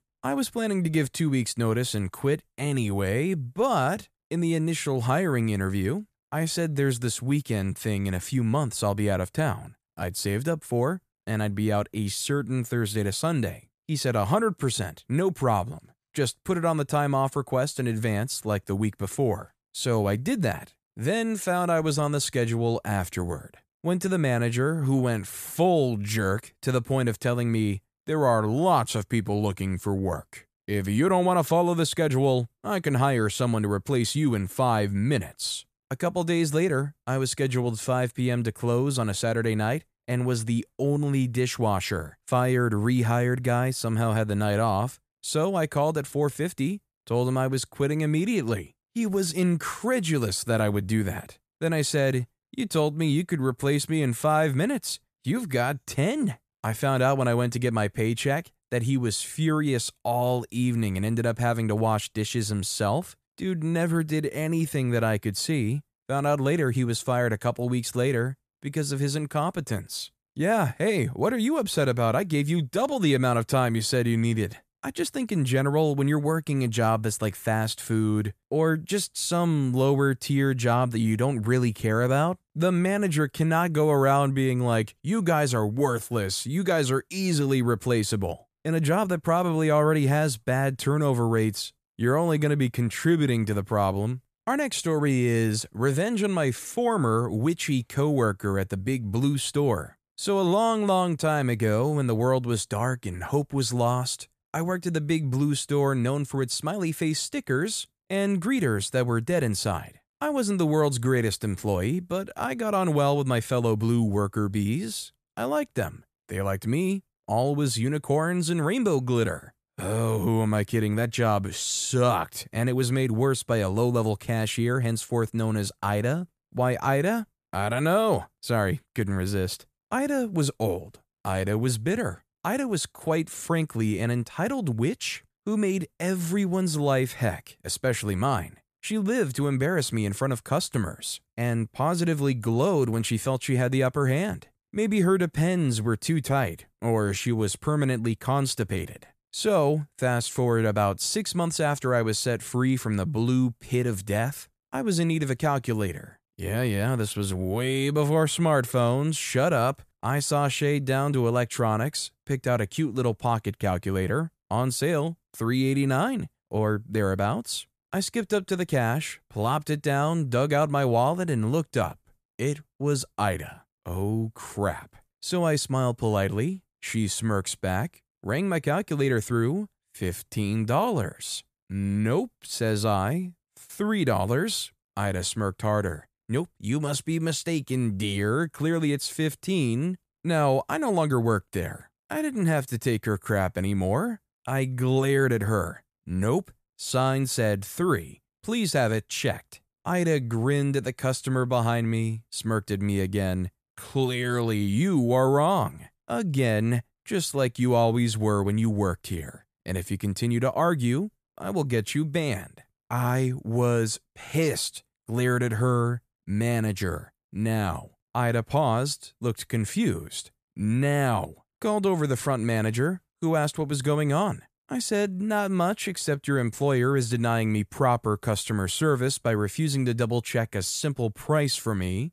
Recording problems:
none

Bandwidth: 14.5 kHz